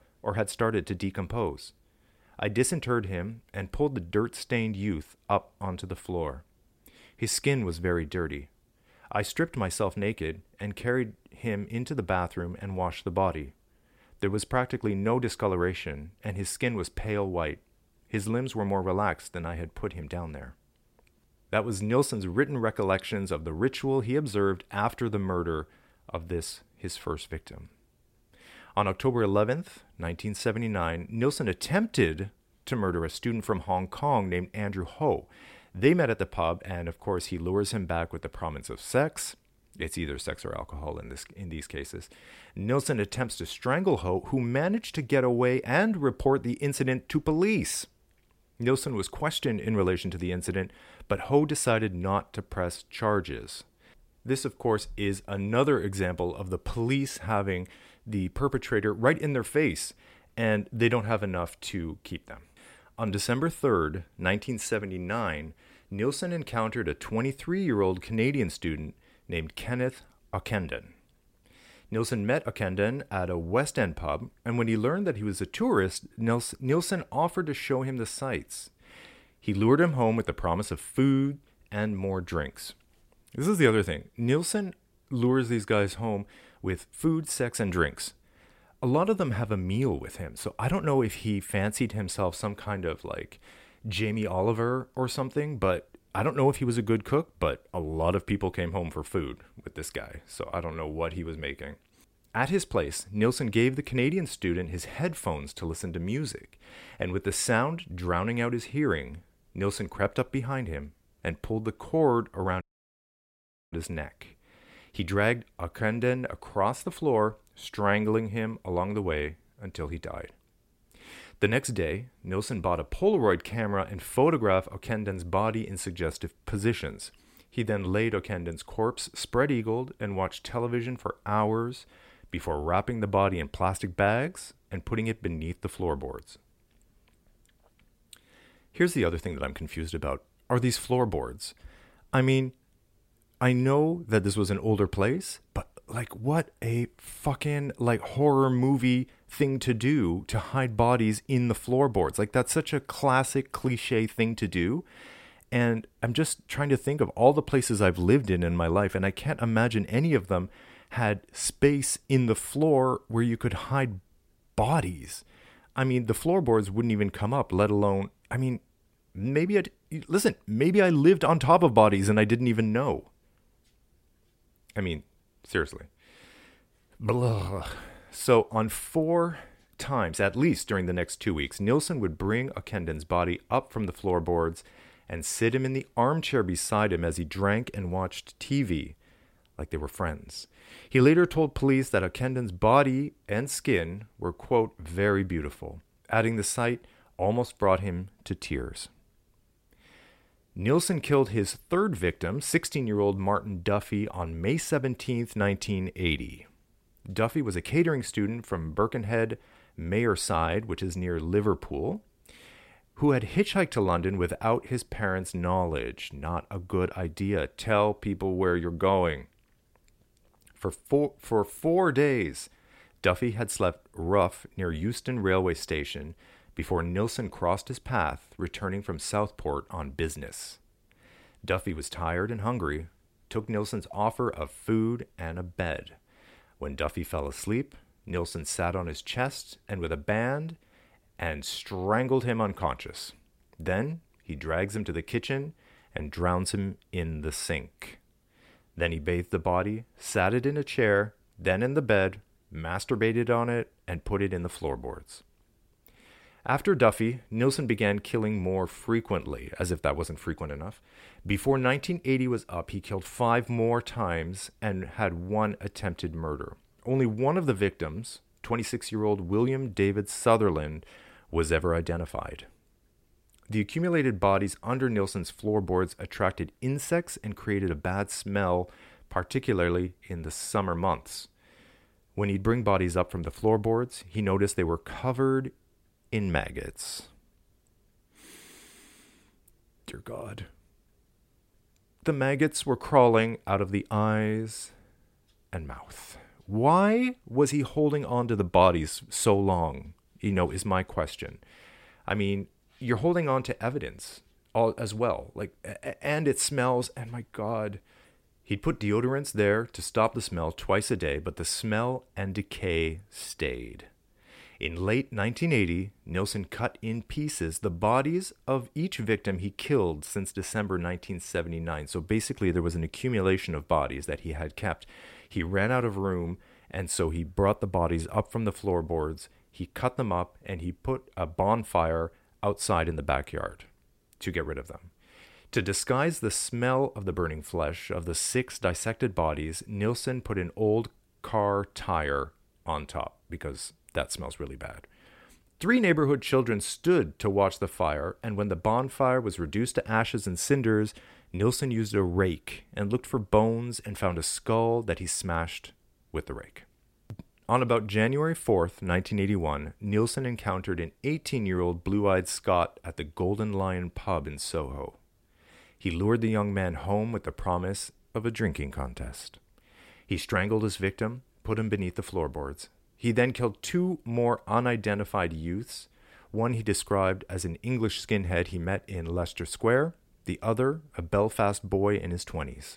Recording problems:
audio cutting out; at 1:53 for 1 s

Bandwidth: 16 kHz